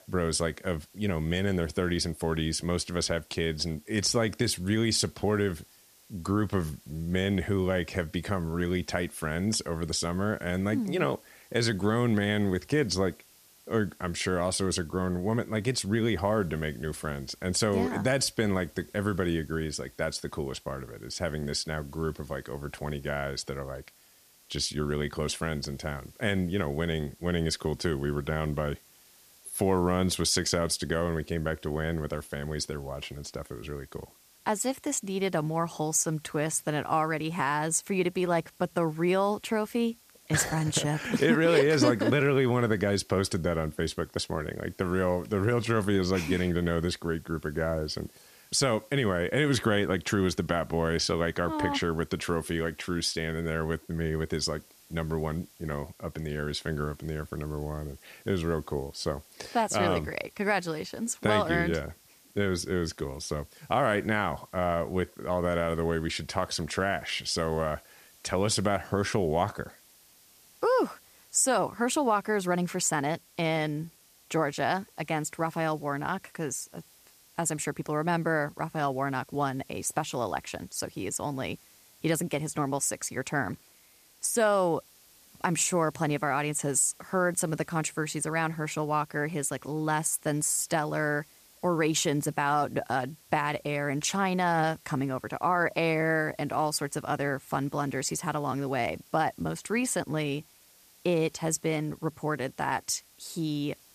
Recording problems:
hiss; faint; throughout; 25 dB below the speech

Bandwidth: 14.5 kHz